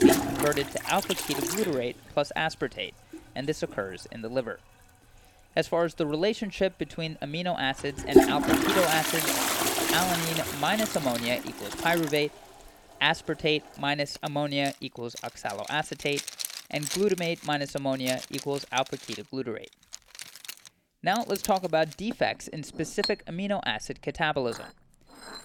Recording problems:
household noises; very loud; throughout; 1 dB above the speech

